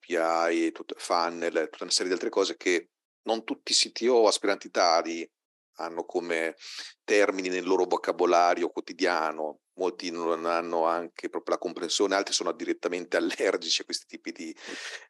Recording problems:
thin; somewhat; fading below 300 Hz

